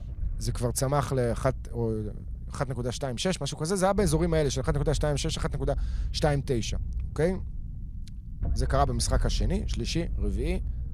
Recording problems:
low rumble; faint; throughout; 20 dB below the speech

